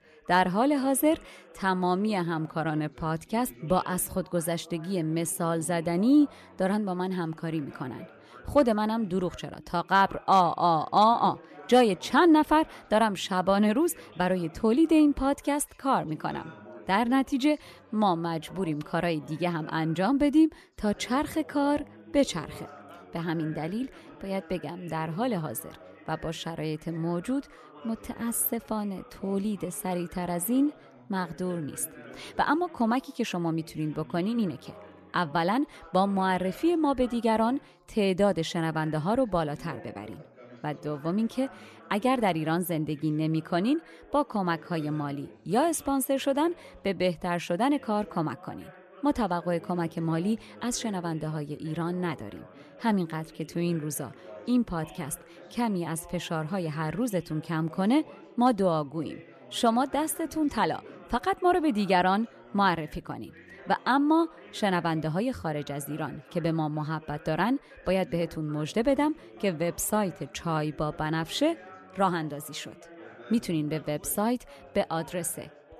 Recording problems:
background chatter; faint; throughout; 3 voices, 20 dB below the speech

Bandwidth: 14 kHz